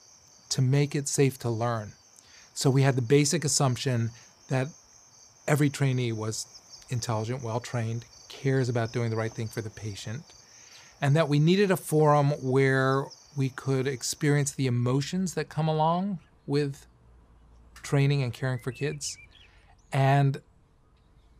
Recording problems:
animal sounds; faint; throughout; 25 dB below the speech

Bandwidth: 15 kHz